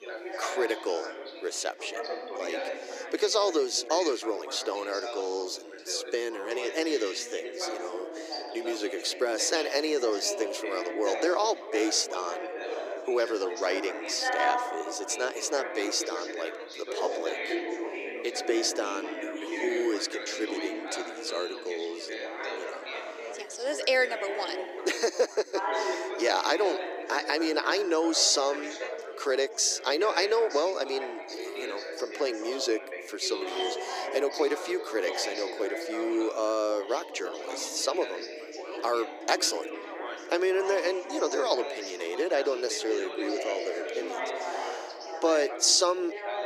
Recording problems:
thin; very; fading below 300 Hz
background chatter; loud; throughout; 4 voices, 7 dB below the speech

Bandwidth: 15 kHz